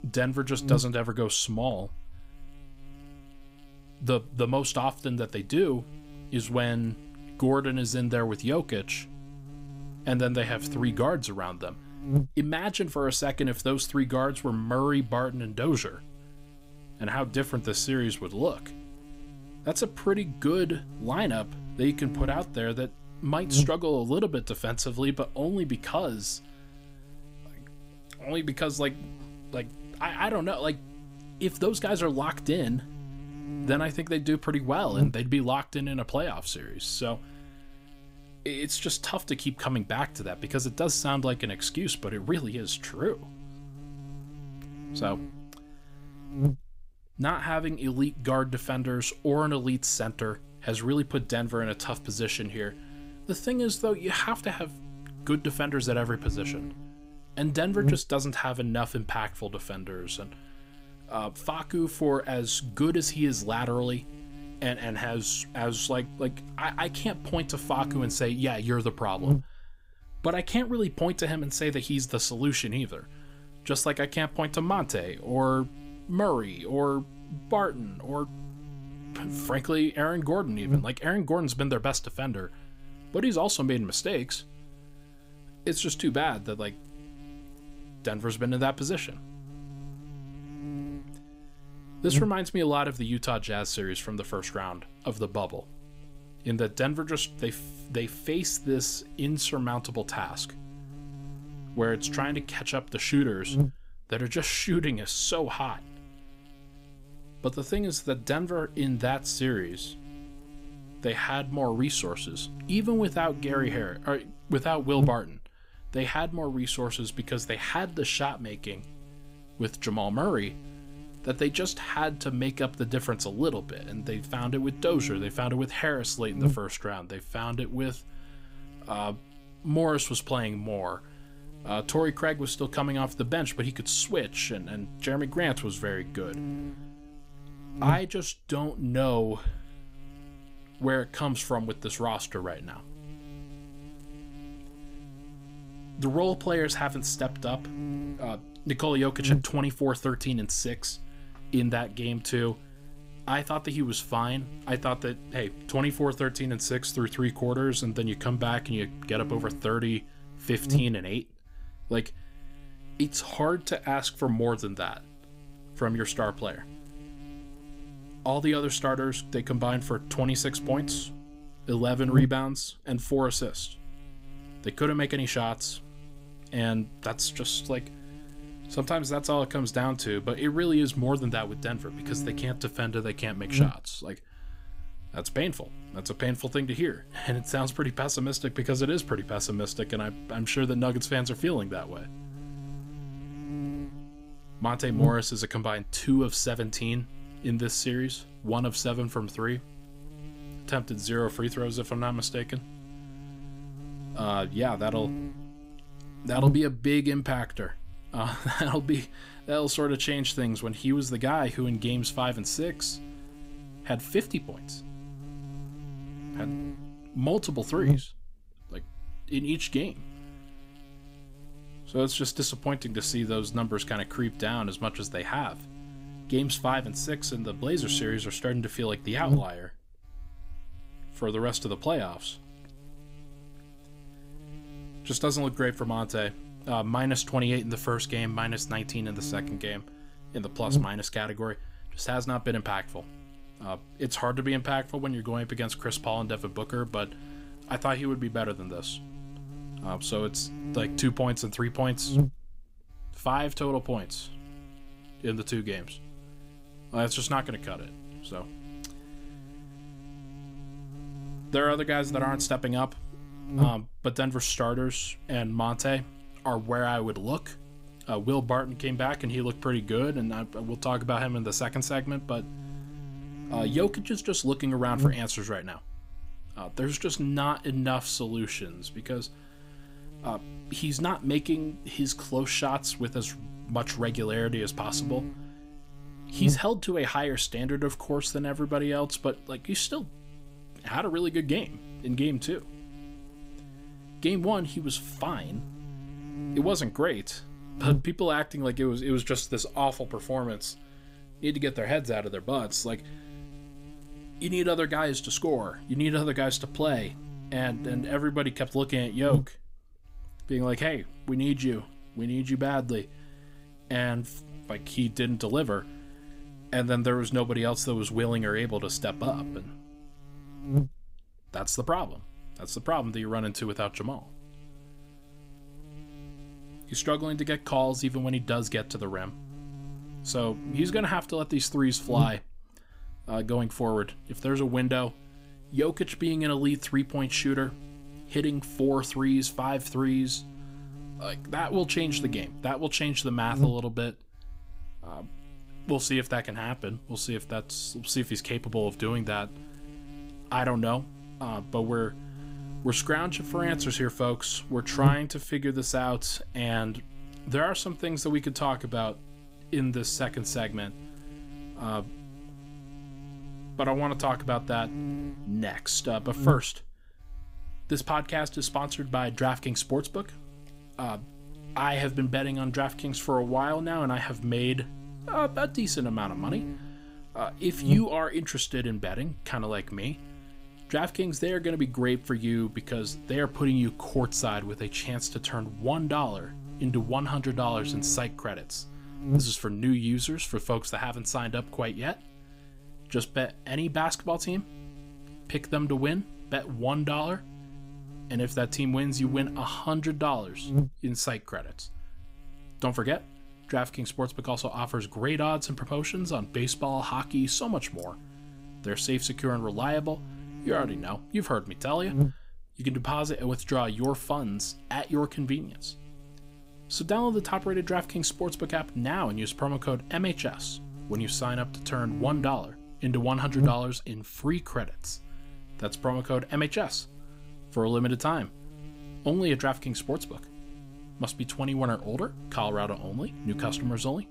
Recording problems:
electrical hum; noticeable; throughout; 60 Hz, 15 dB below the speech

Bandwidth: 15.5 kHz